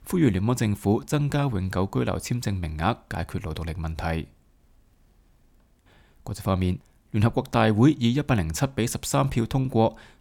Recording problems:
none

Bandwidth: 17.5 kHz